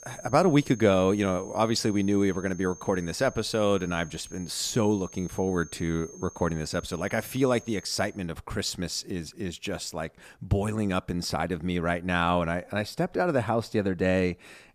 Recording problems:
high-pitched whine; noticeable; until 8 s; 6.5 kHz, 20 dB below the speech

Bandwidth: 14.5 kHz